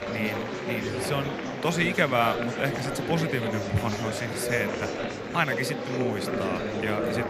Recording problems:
murmuring crowd; loud; throughout; 1 dB below the speech

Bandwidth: 14 kHz